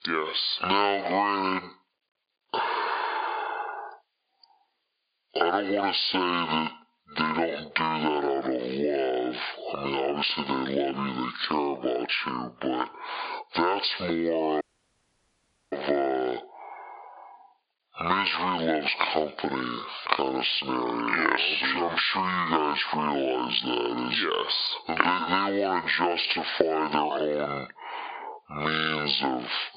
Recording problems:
high frequencies cut off; severe; nothing above 5 kHz
squashed, flat; heavily
wrong speed and pitch; too slow and too low; 0.6 times normal speed
thin; somewhat; fading below 500 Hz
audio cutting out; at 15 s for 1 s

